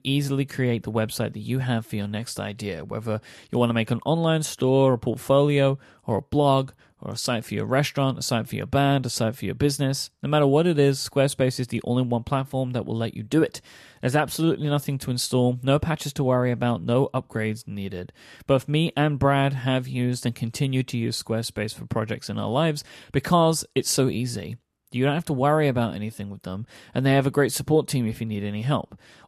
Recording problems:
none

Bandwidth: 13.5 kHz